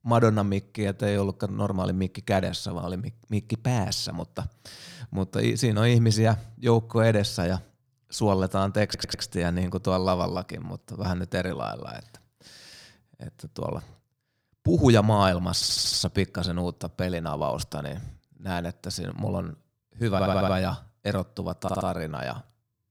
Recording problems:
audio stuttering; 4 times, first at 9 s

